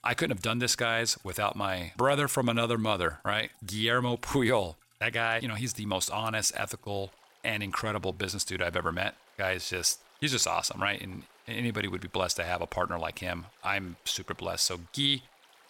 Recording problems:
rain or running water; faint; throughout; 30 dB below the speech

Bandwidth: 16.5 kHz